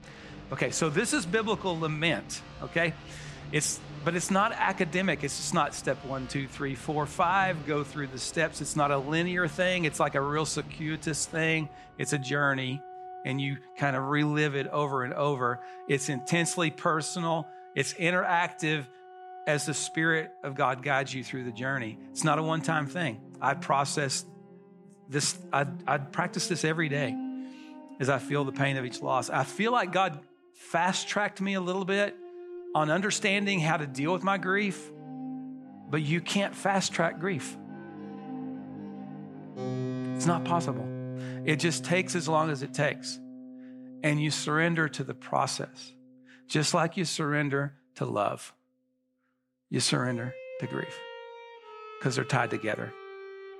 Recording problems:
background music; noticeable; throughout; 15 dB below the speech

